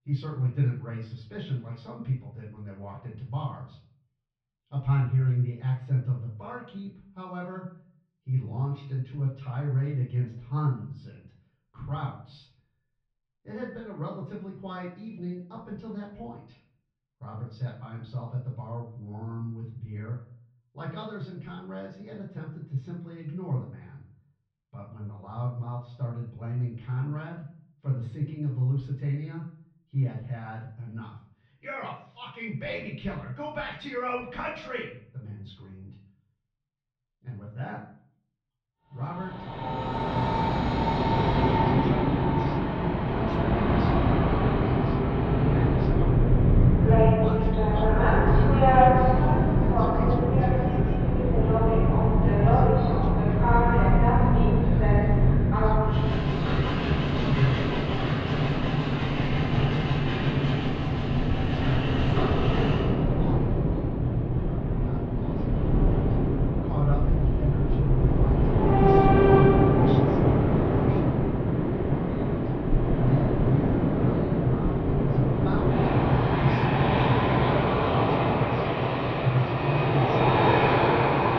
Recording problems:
off-mic speech; far
muffled; slightly; fading above 3.5 kHz
room echo; slight; dies away in 0.4 s
train or aircraft noise; very loud; from 40 s on; 10 dB above the speech

